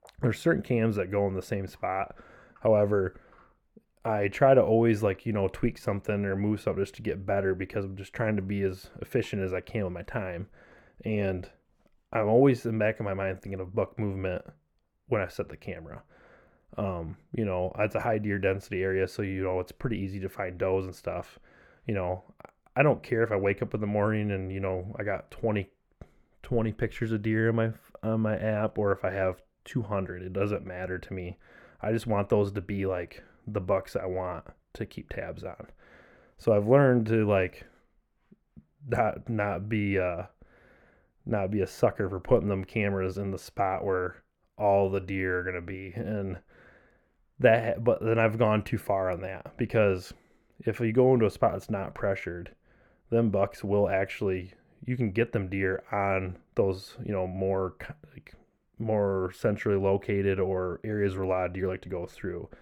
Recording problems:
muffled; slightly; fading above 2.5 kHz

